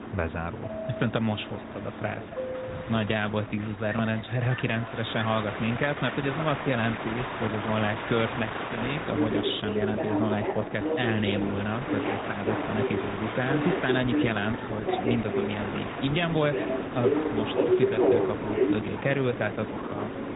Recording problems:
garbled, watery; badly
high frequencies cut off; severe; nothing above 4 kHz
train or aircraft noise; loud; throughout; 1 dB below the speech

